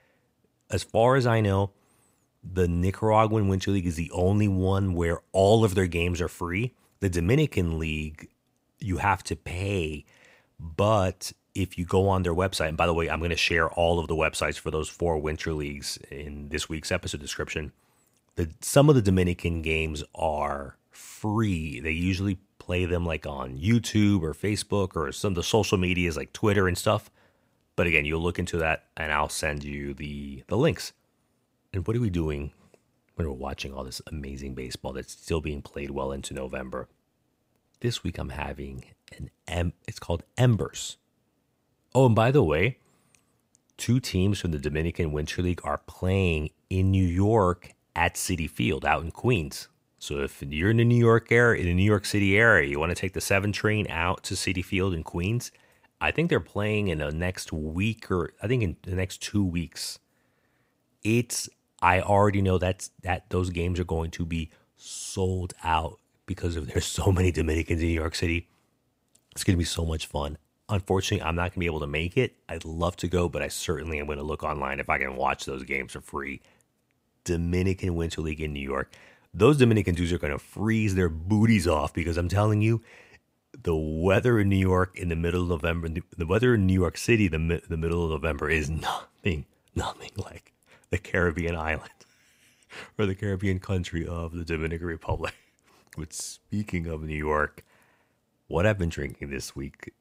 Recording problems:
none

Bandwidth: 15.5 kHz